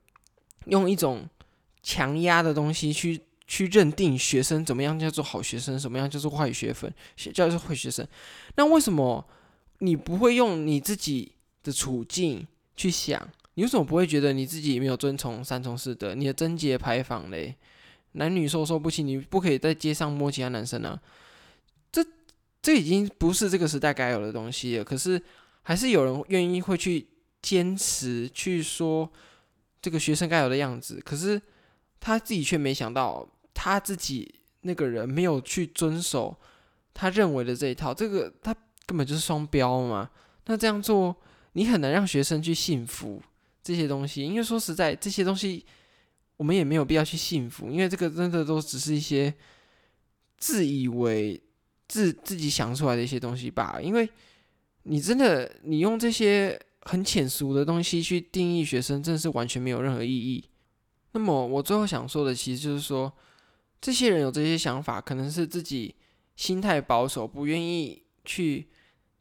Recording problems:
none

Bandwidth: 18.5 kHz